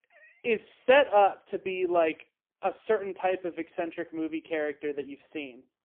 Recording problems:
phone-call audio; poor line; nothing above 3 kHz

